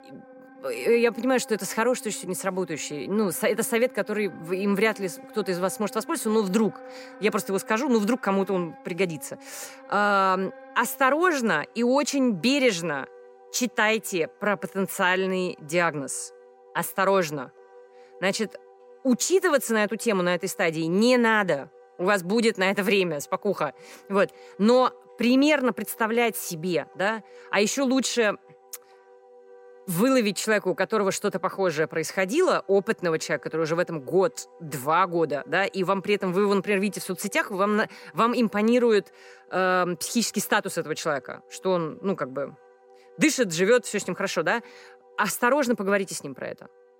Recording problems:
background music; faint; throughout; 25 dB below the speech

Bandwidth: 16 kHz